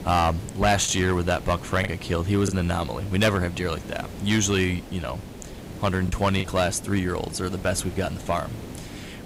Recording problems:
distortion; slight; 3% of the sound clipped
hiss; noticeable; throughout; 15 dB below the speech
choppy; very; from 1 to 2.5 s and at 6 s; 5% of the speech affected

